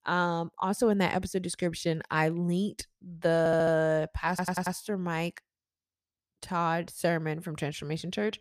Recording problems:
audio stuttering; at 3.5 s and at 4.5 s

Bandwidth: 14.5 kHz